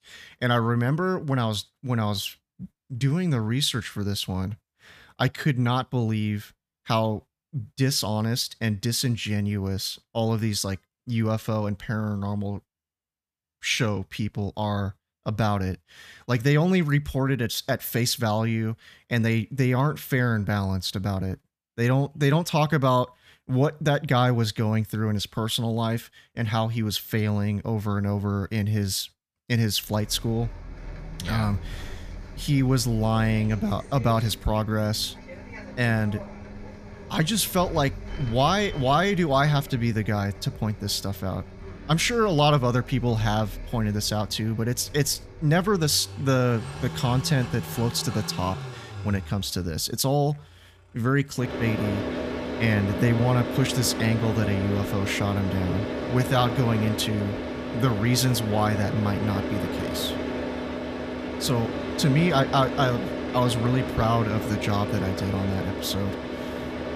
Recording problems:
traffic noise; loud; from 30 s on; 8 dB below the speech

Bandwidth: 14.5 kHz